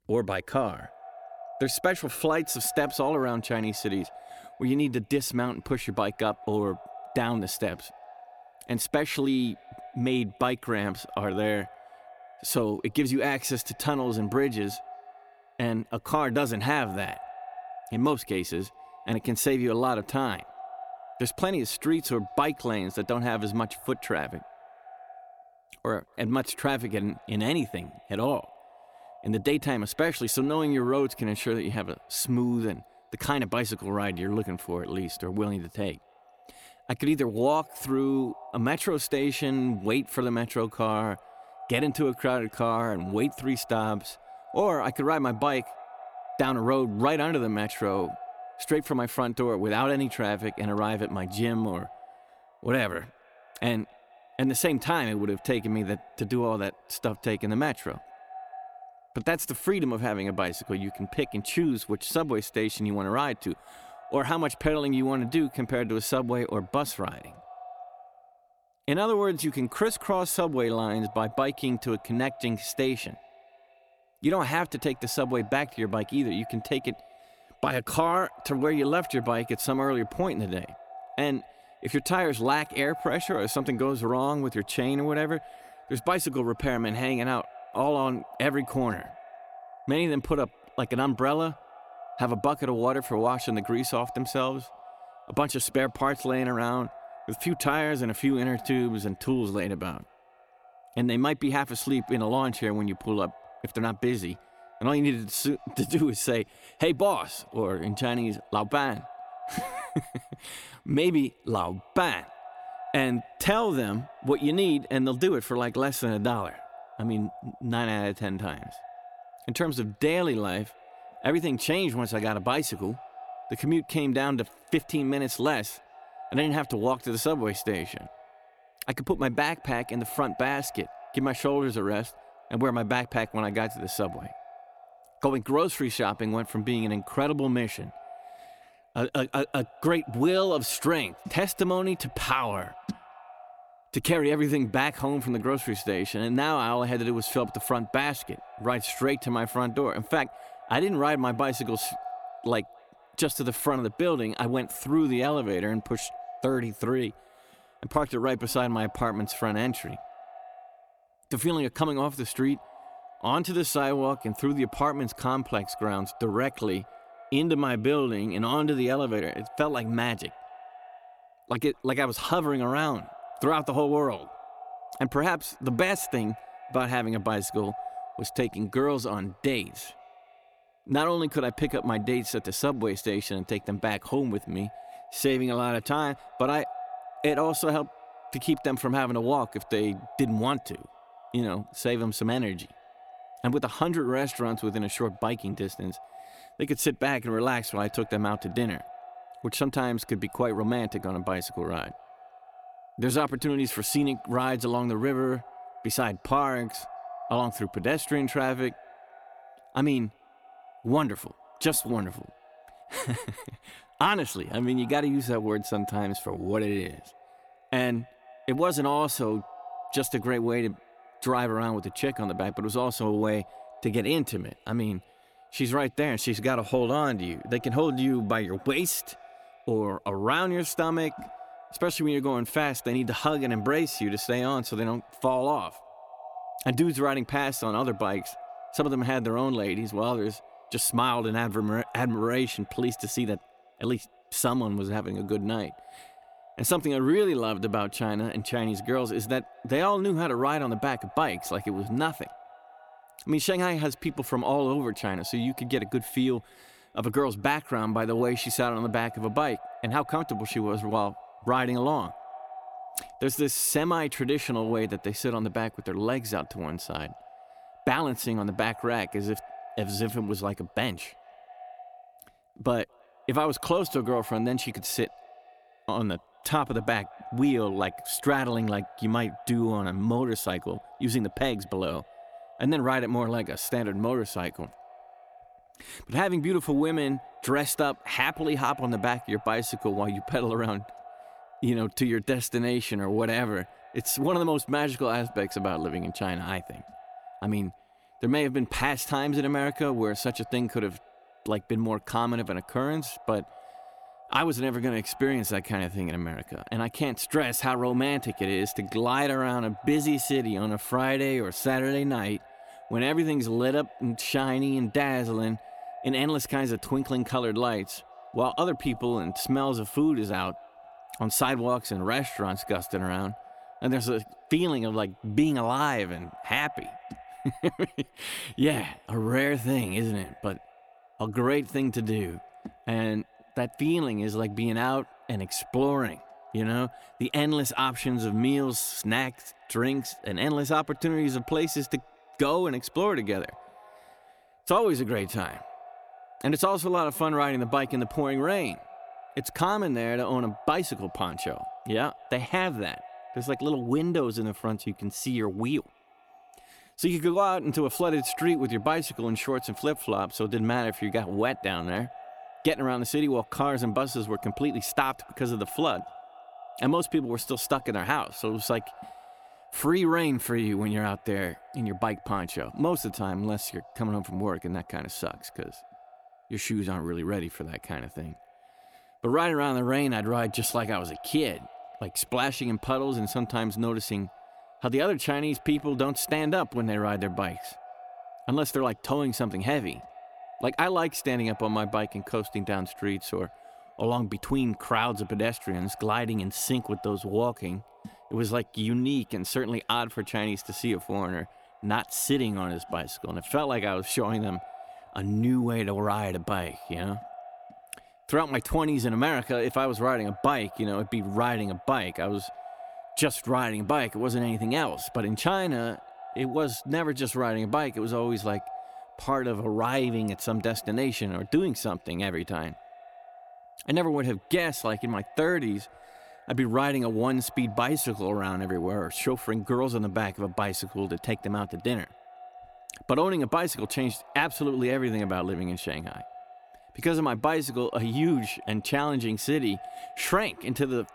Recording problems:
echo of what is said; noticeable; throughout; 220 ms later, 20 dB below the speech

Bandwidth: 18.5 kHz